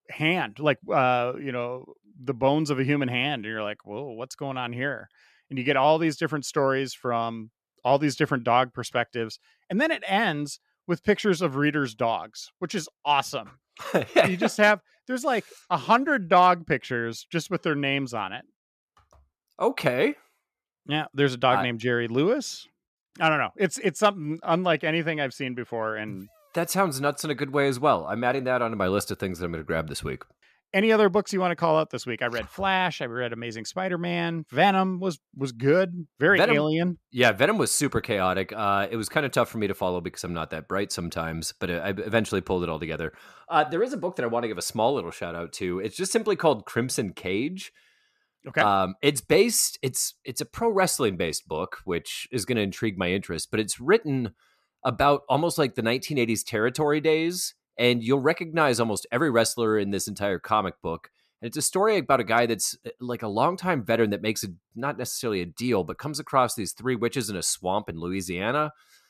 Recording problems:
none

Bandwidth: 14.5 kHz